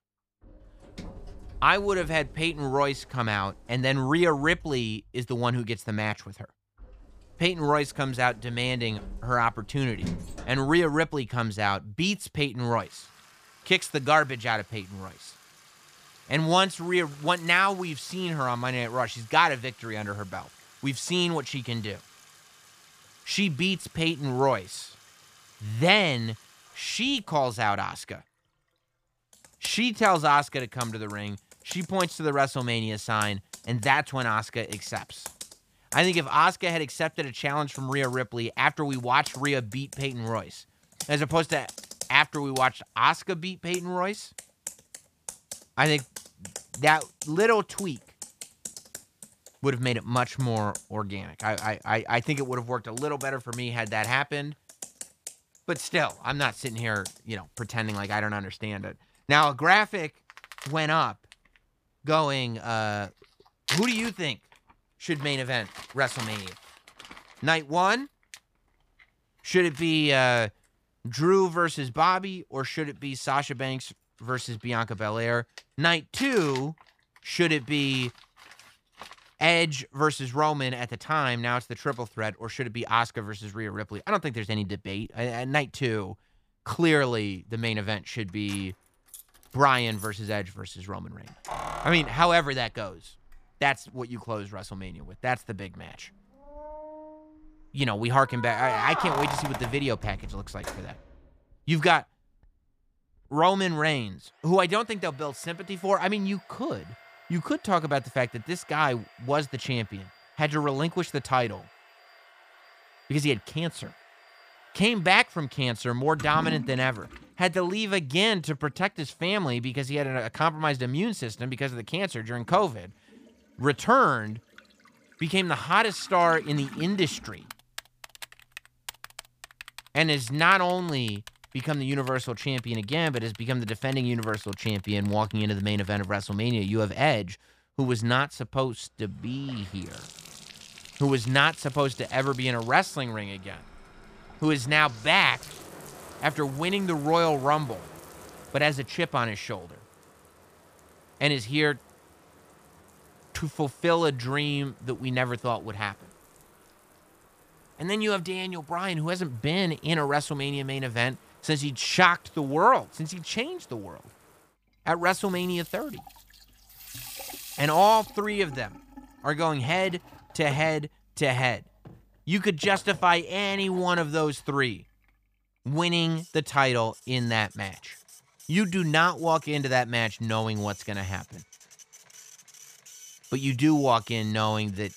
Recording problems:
household noises; noticeable; throughout; 15 dB below the speech

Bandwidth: 15 kHz